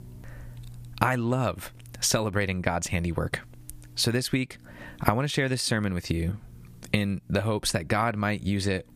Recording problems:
squashed, flat; heavily

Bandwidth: 15 kHz